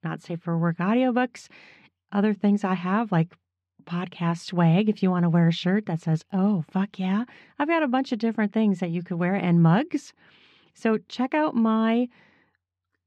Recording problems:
muffled; slightly; fading above 3 kHz

